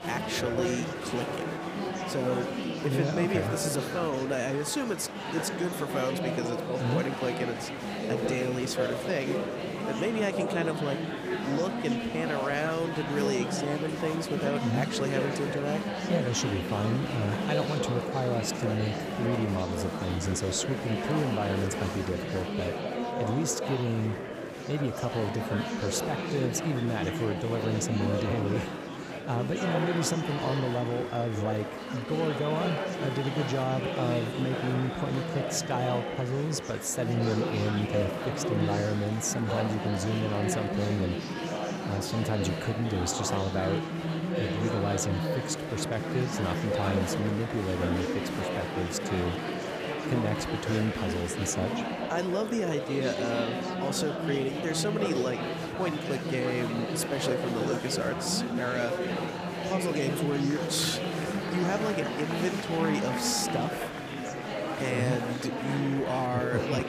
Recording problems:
murmuring crowd; loud; throughout; 1 dB below the speech

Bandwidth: 15 kHz